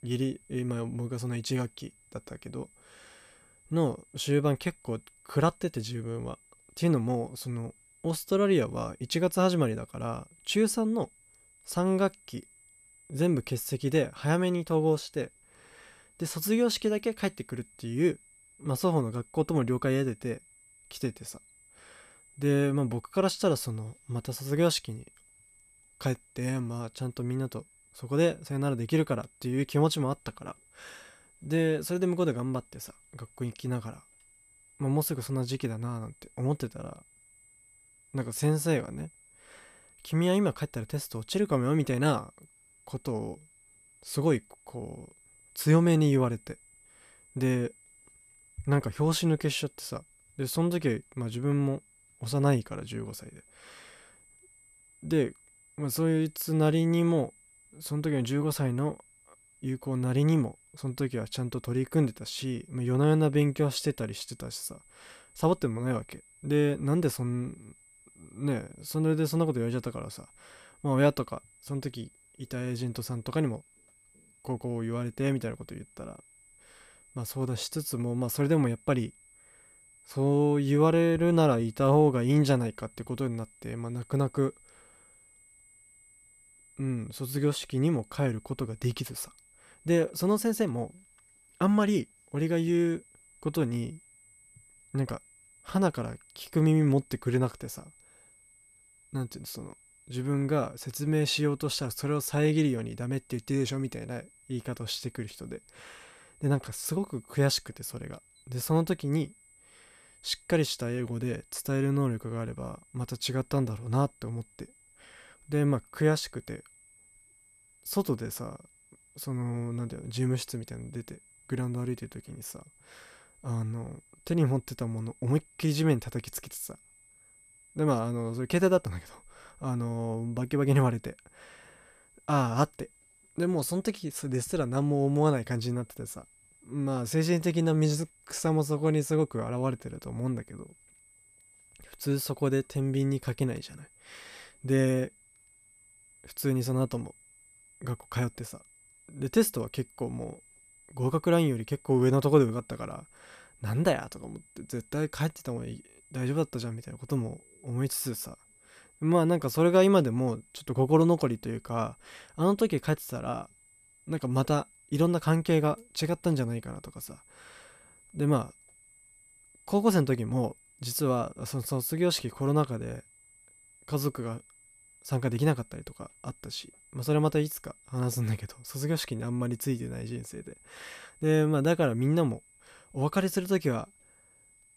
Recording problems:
high-pitched whine; faint; throughout; 8 kHz, 30 dB below the speech

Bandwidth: 14.5 kHz